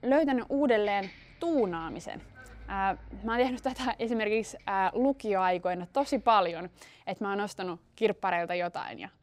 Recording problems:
traffic noise; faint; throughout; 25 dB below the speech

